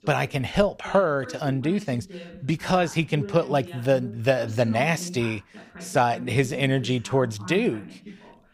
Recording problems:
voice in the background; noticeable; throughout; 15 dB below the speech

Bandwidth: 15 kHz